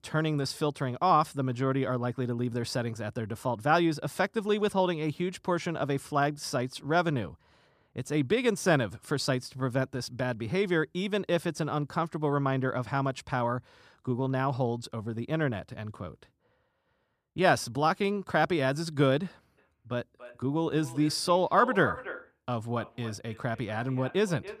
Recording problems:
echo of what is said; noticeable; from 20 s on; 290 ms later, 15 dB below the speech

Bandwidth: 14.5 kHz